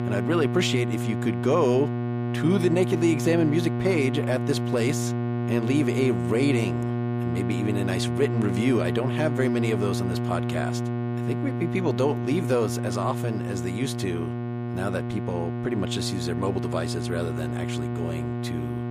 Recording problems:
electrical hum; loud; throughout; 60 Hz, 5 dB below the speech

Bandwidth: 15 kHz